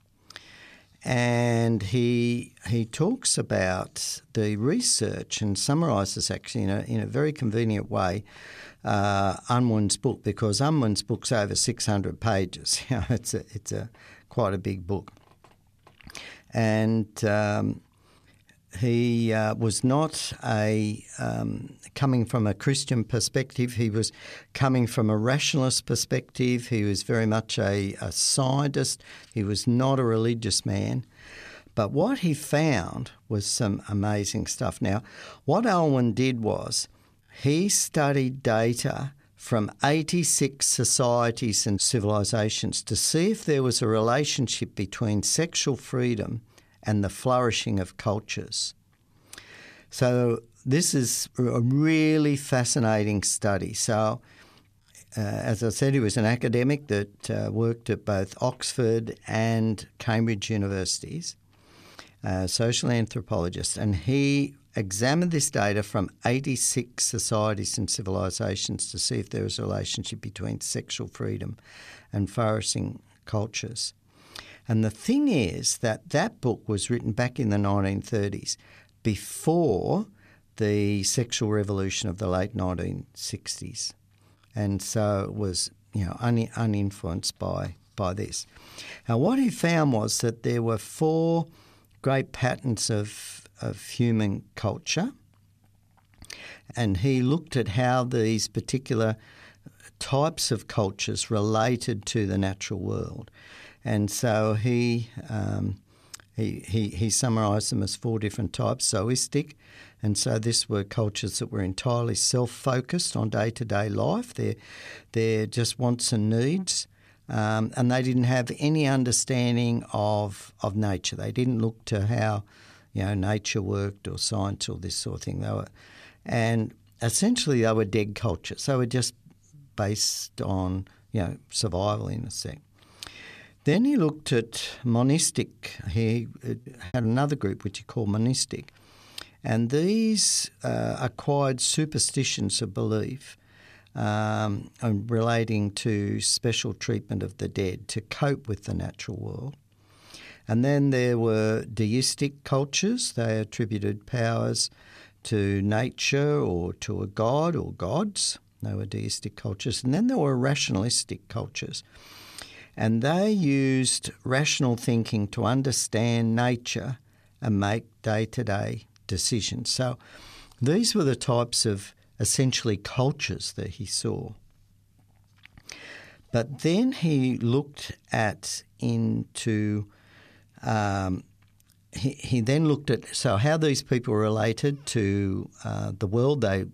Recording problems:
choppy; occasionally; at 2:17; 3% of the speech affected

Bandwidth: 14 kHz